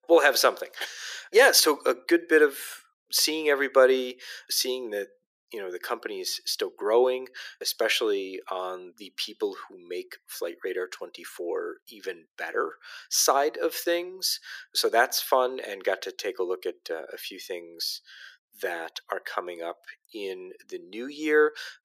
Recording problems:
thin; very; fading below 350 Hz

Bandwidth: 15 kHz